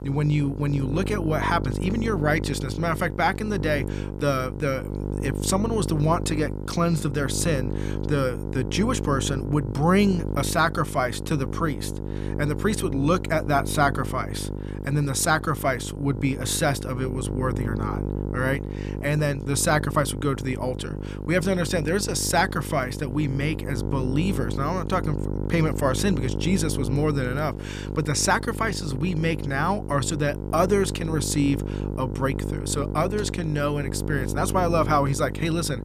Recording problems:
electrical hum; noticeable; throughout; 50 Hz, 10 dB below the speech

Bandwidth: 14.5 kHz